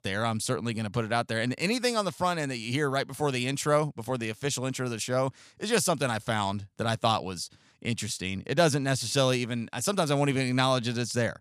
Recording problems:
none

